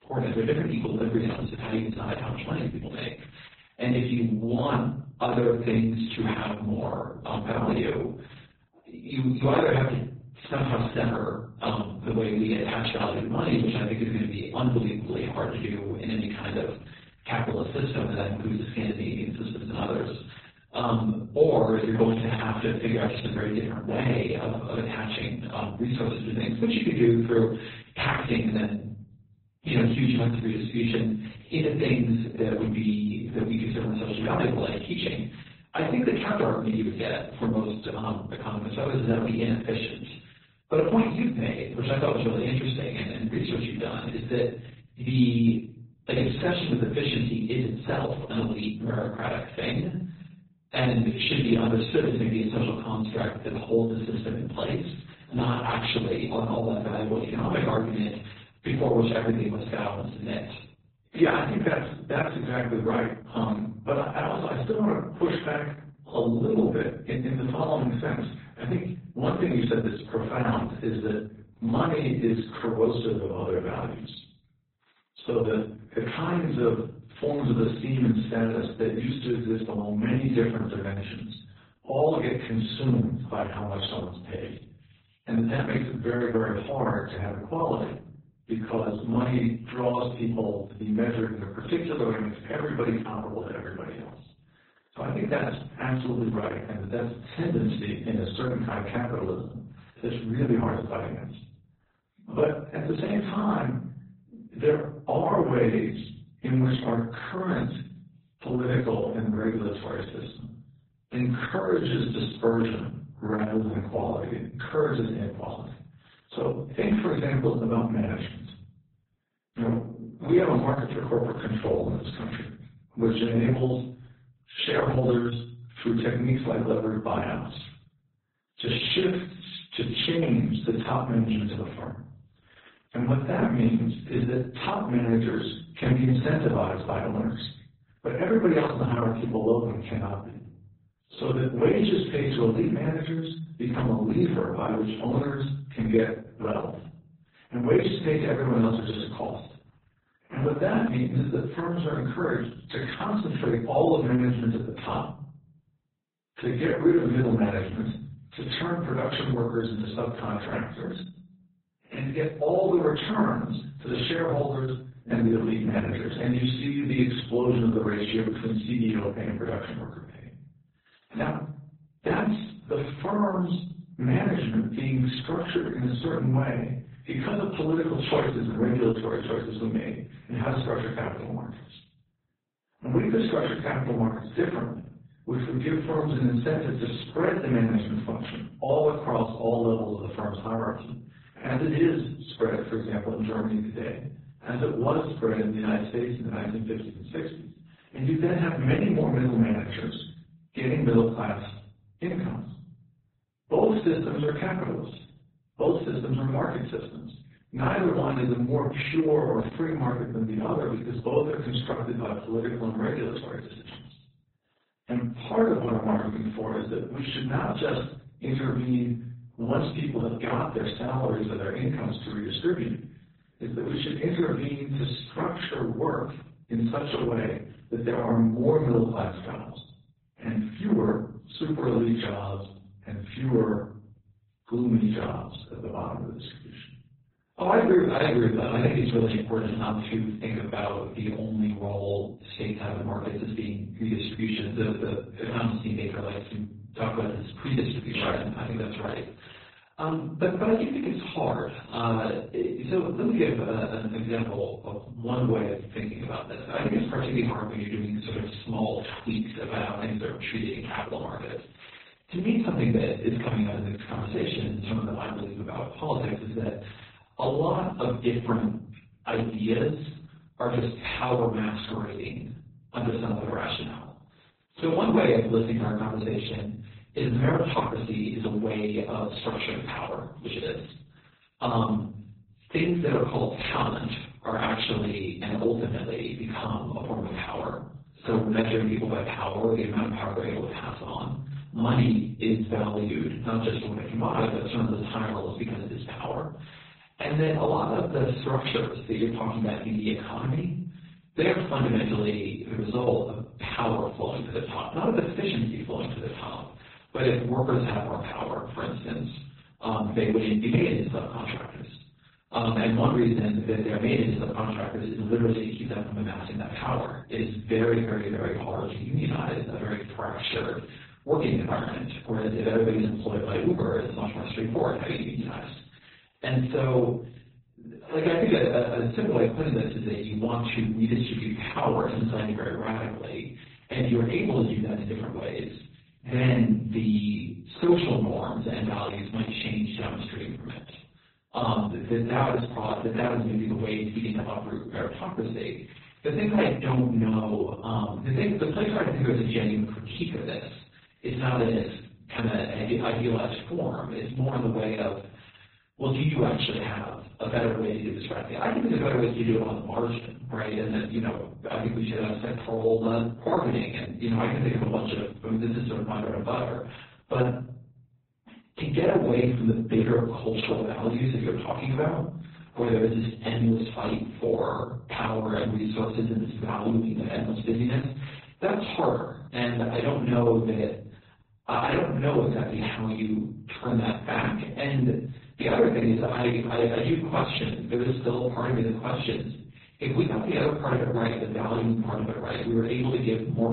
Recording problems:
off-mic speech; far
garbled, watery; badly; nothing above 4 kHz
room echo; noticeable; dies away in 0.5 s

